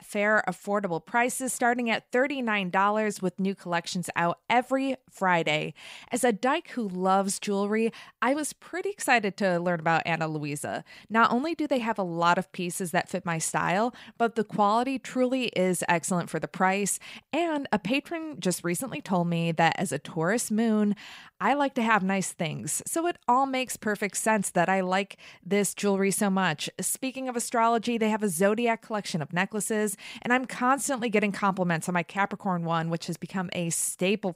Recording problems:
none

